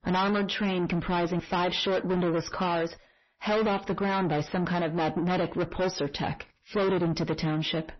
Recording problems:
distortion; heavy; 6 dB below the speech
garbled, watery; slightly; nothing above 6 kHz

